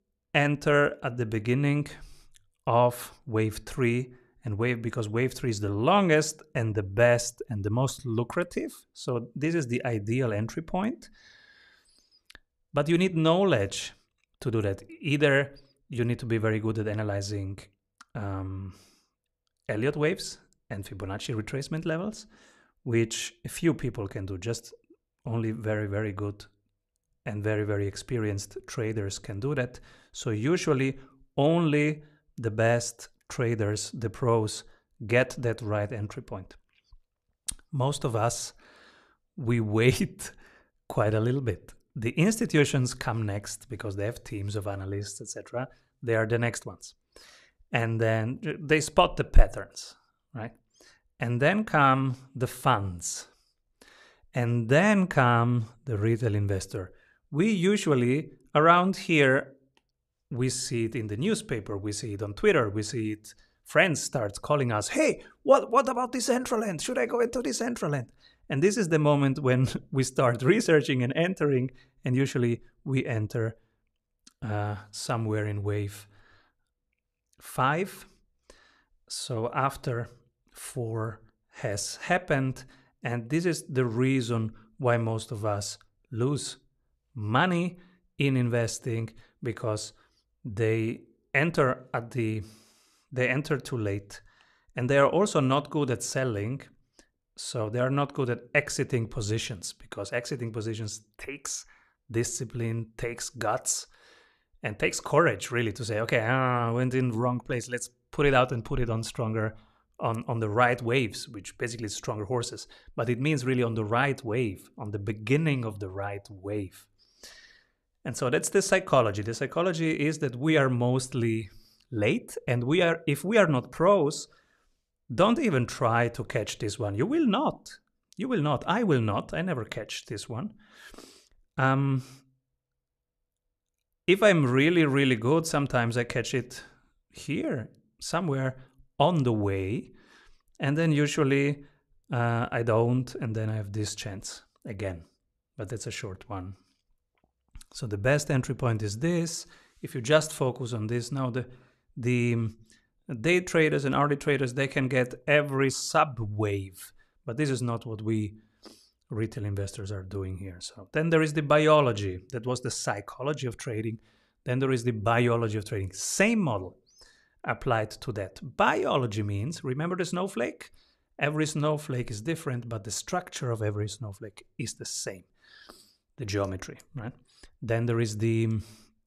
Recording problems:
none

